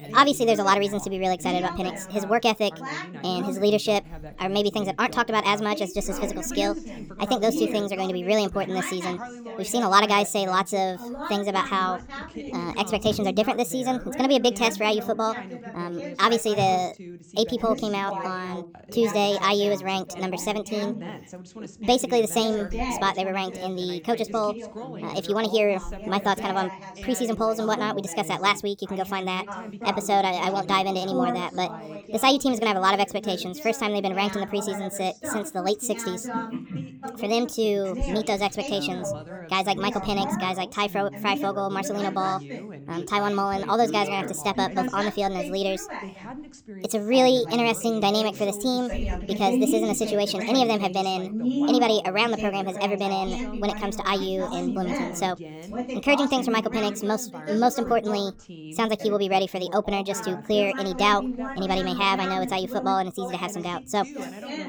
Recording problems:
wrong speed and pitch; too fast and too high; 1.5 times normal speed
background chatter; loud; throughout; 2 voices, 10 dB below the speech

